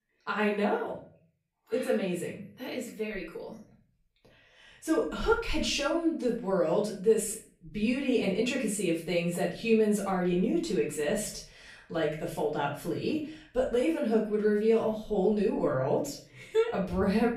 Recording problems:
off-mic speech; far
room echo; slight; dies away in 0.4 s

